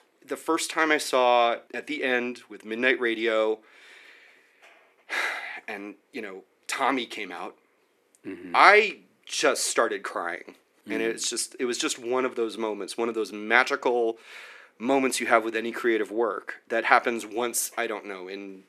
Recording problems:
thin; somewhat; fading below 300 Hz

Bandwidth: 13.5 kHz